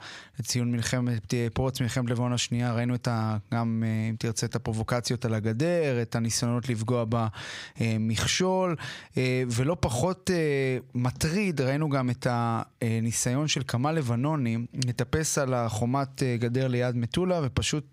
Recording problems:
squashed, flat; somewhat

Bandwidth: 15.5 kHz